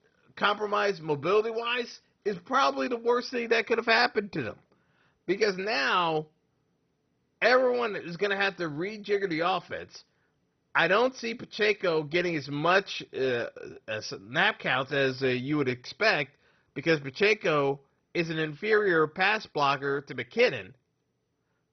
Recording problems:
garbled, watery; badly; nothing above 6 kHz

